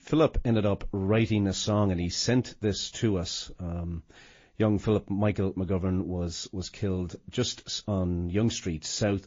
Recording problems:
garbled, watery; slightly; nothing above 7 kHz

